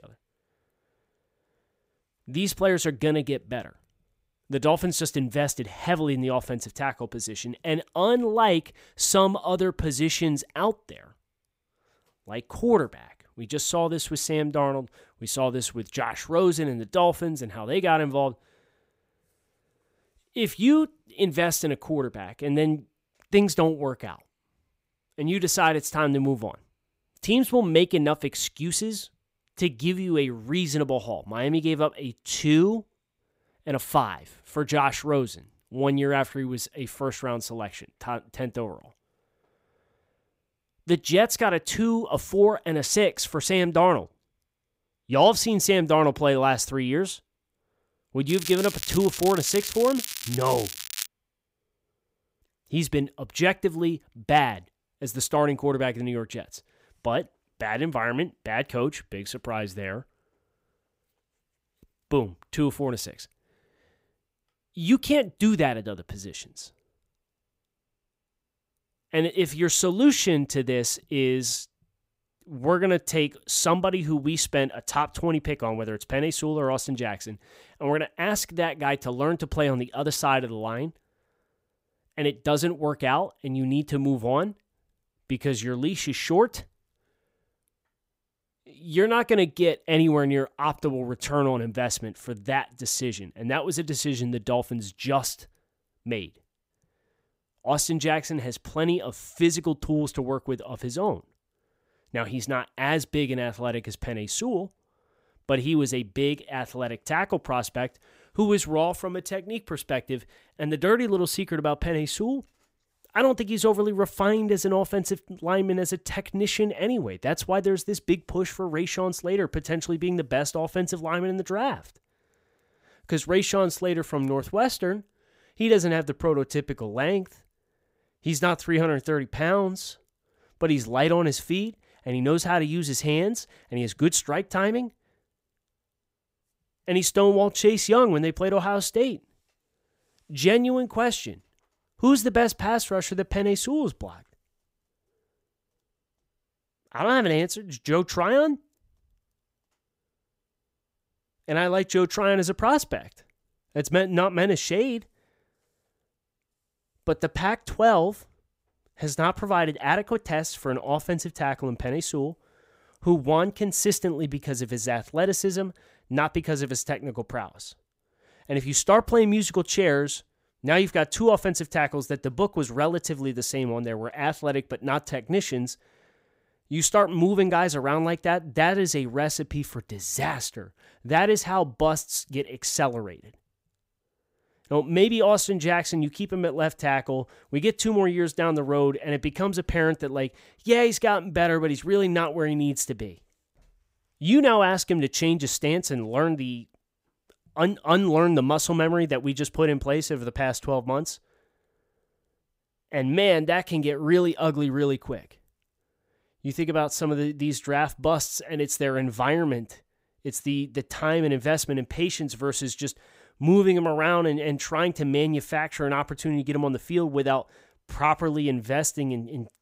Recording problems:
crackling; loud; from 48 to 51 s; 8 dB below the speech

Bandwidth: 15.5 kHz